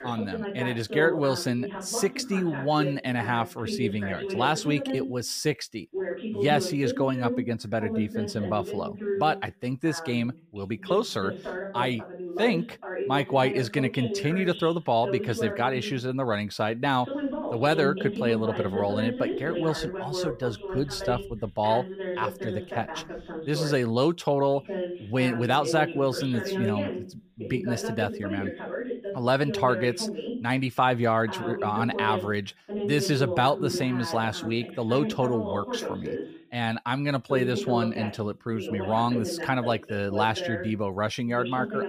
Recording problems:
voice in the background; loud; throughout; 6 dB below the speech

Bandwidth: 15 kHz